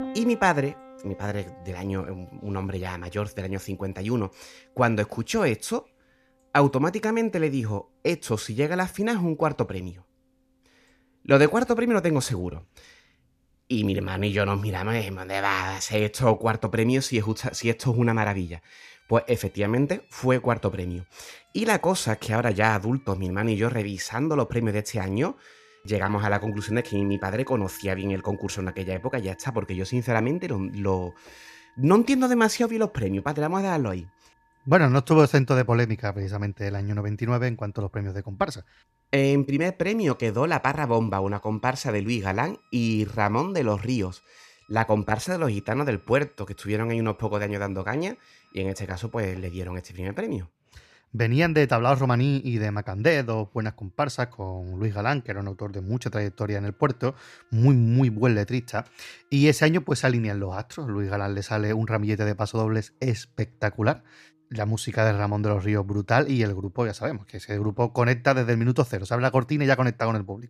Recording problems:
background music; faint; throughout; 30 dB below the speech

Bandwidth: 14.5 kHz